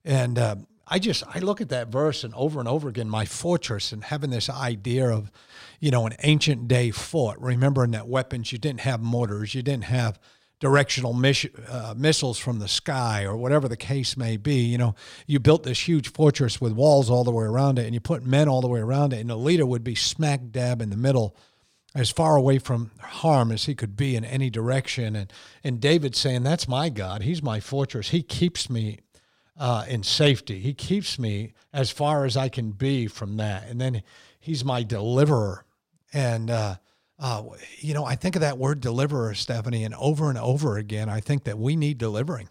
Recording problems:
none

